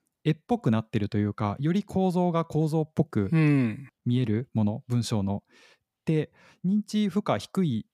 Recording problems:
none

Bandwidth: 15.5 kHz